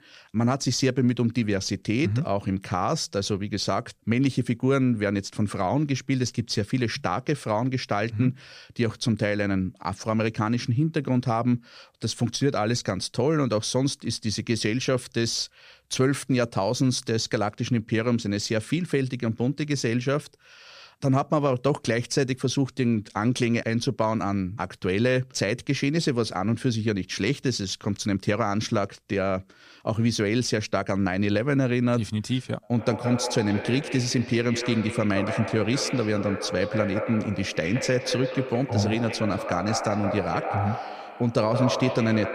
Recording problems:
echo of what is said; strong; from 33 s on; 170 ms later, 7 dB below the speech

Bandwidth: 14.5 kHz